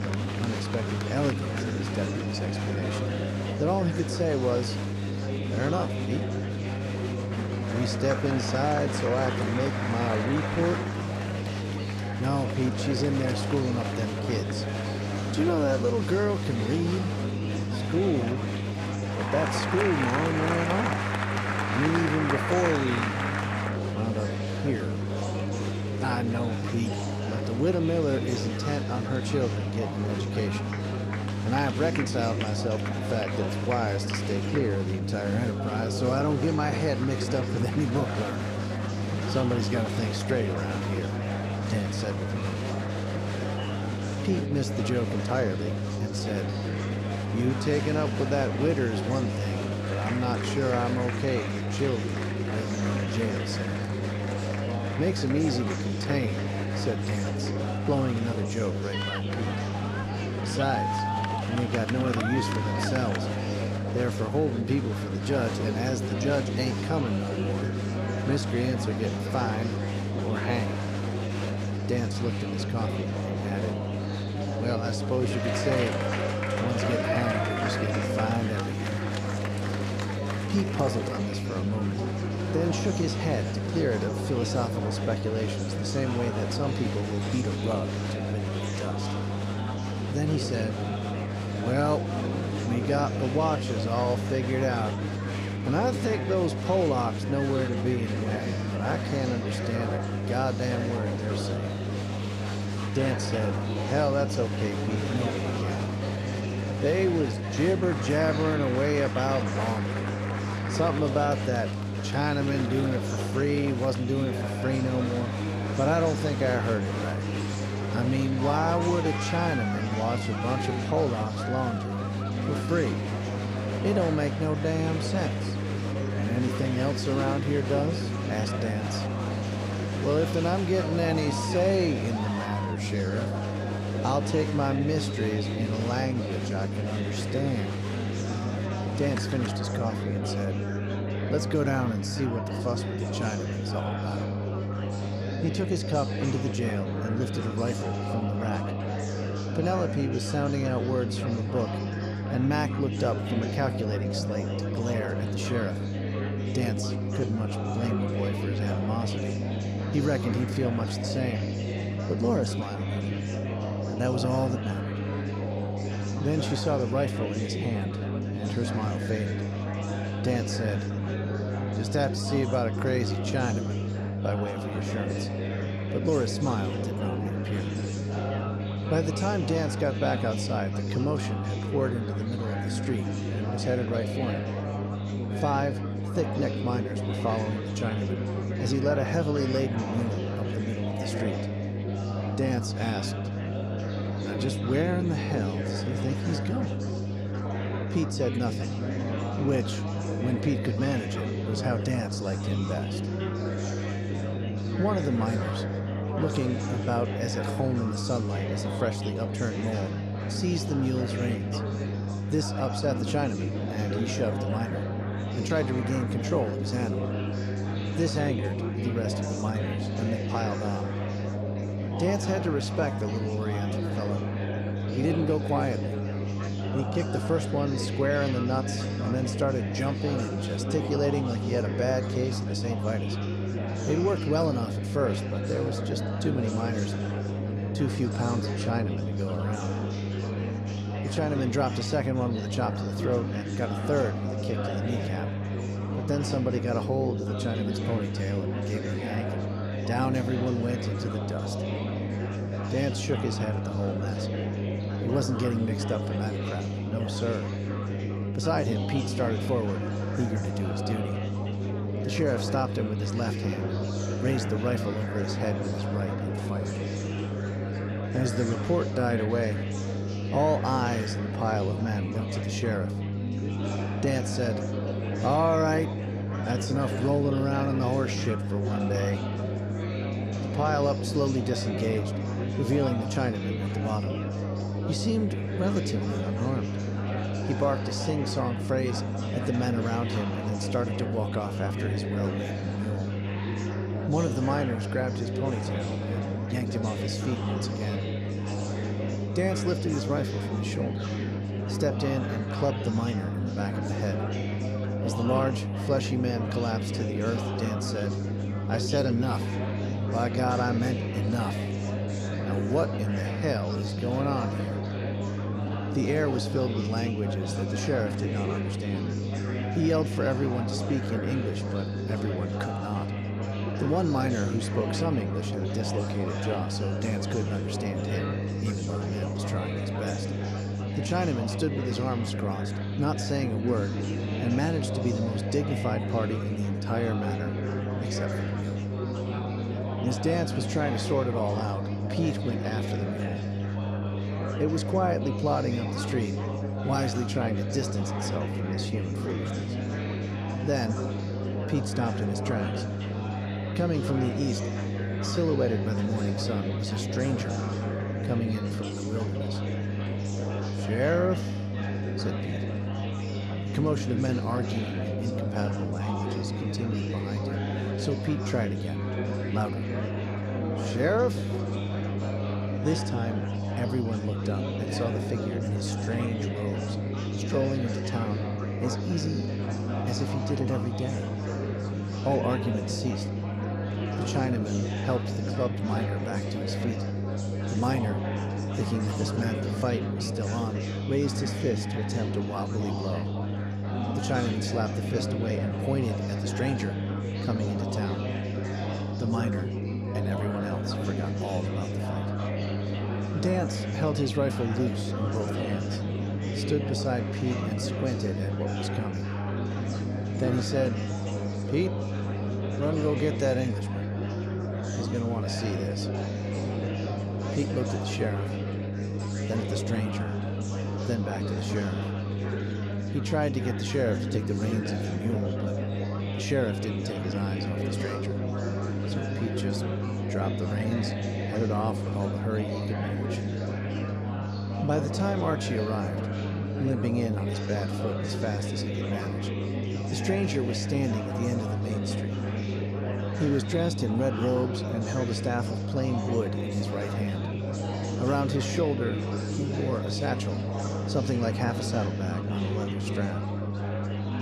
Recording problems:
electrical hum; loud; throughout; 50 Hz, 10 dB below the speech
chatter from many people; loud; throughout; 4 dB below the speech

